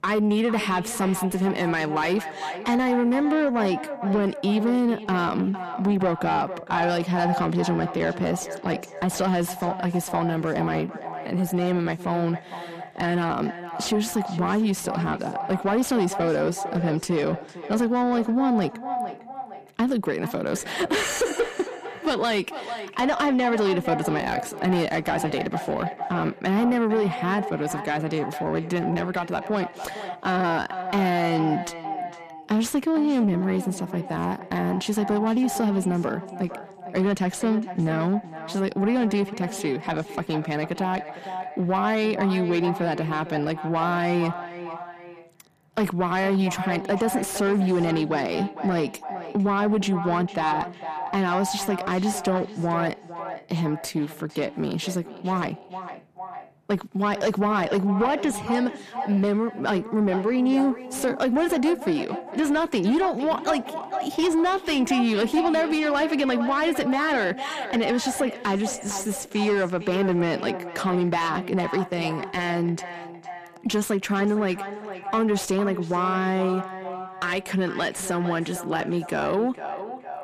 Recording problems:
echo of what is said; strong; throughout; 460 ms later, 10 dB below the speech
distortion; slight; 10 dB below the speech

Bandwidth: 14.5 kHz